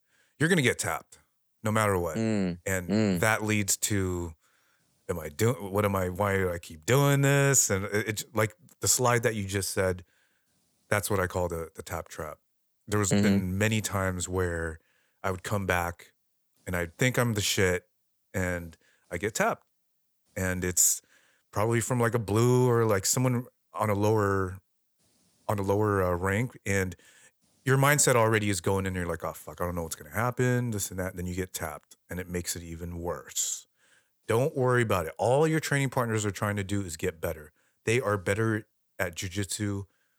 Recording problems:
none

